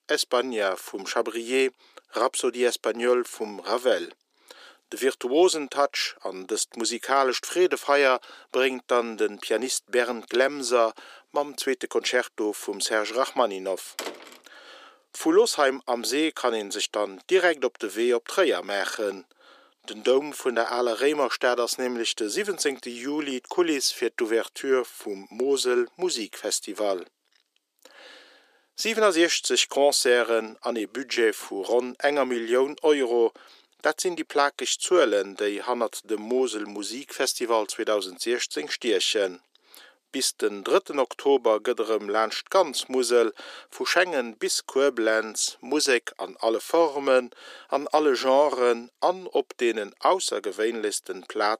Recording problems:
thin; very; fading below 350 Hz
door banging; faint; at 14 s; peak 10 dB below the speech

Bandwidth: 15 kHz